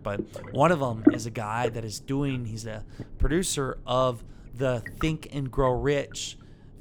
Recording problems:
low rumble; loud; throughout; 6 dB below the speech

